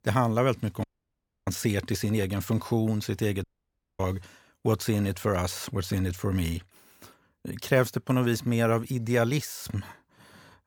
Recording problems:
audio cutting out; at 1 s for 0.5 s and at 3.5 s for 0.5 s

